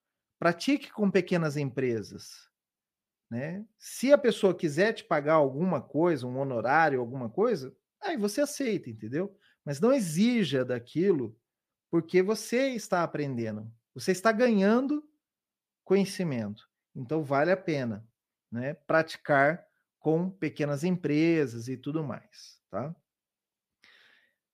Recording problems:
none

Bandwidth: 15 kHz